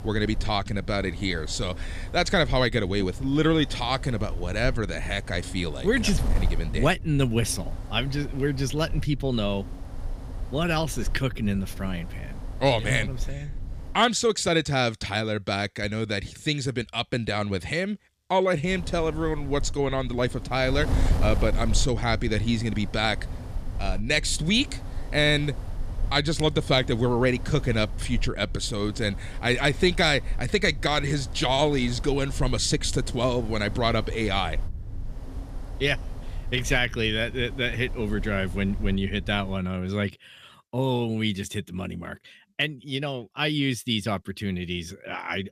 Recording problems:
wind noise on the microphone; occasional gusts; until 14 s and from 19 to 40 s; 20 dB below the speech

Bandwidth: 15 kHz